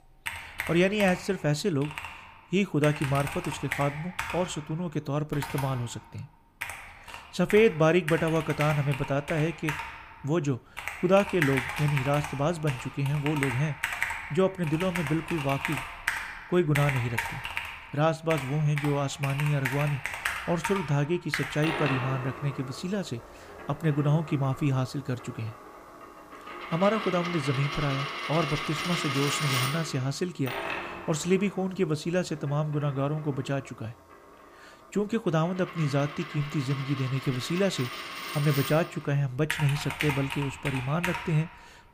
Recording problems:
household noises; loud; throughout; 6 dB below the speech

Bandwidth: 15 kHz